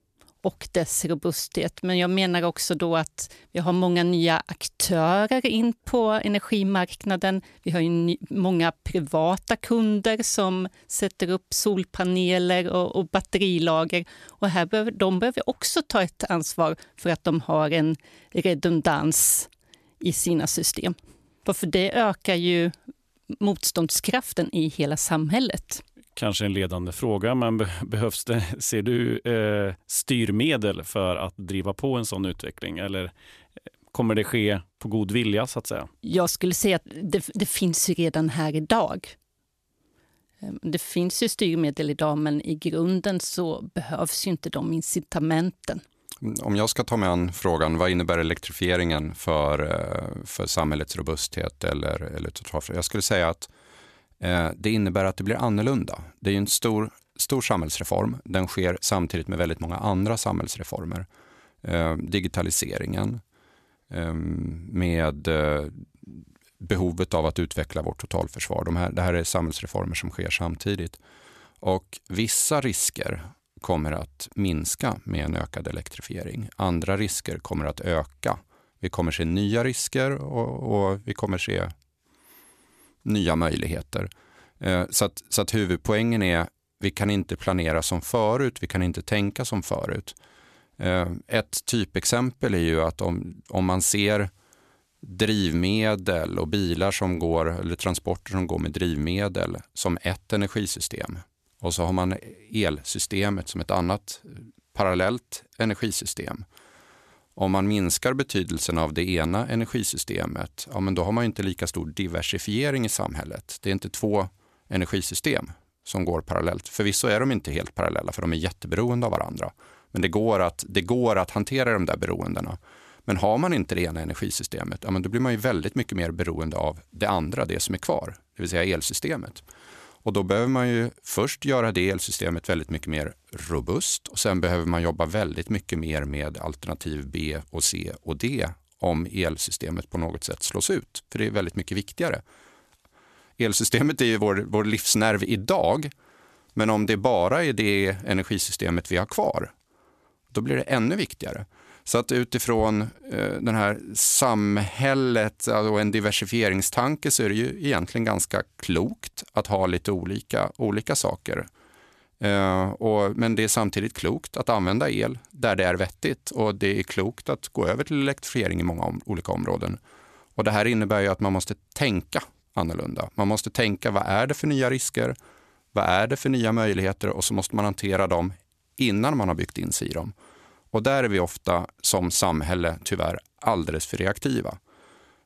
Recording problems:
none

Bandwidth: 14 kHz